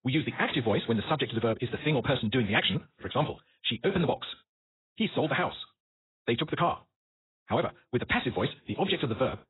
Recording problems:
garbled, watery; badly; nothing above 4 kHz
wrong speed, natural pitch; too fast; 1.8 times normal speed

